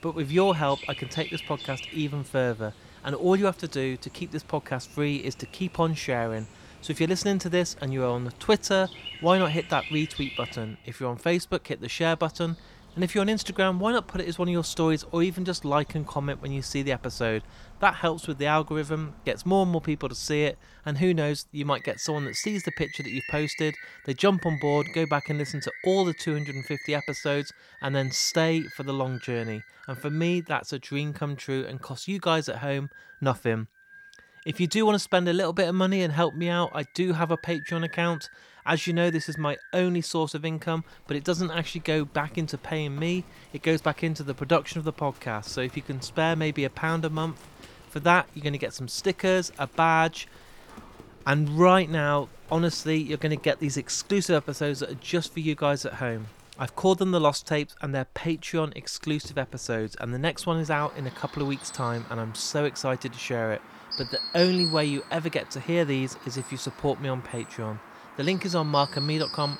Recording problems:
animal sounds; noticeable; throughout; 15 dB below the speech

